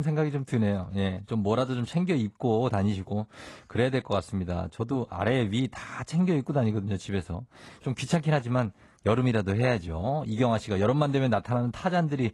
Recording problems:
garbled, watery; slightly
abrupt cut into speech; at the start

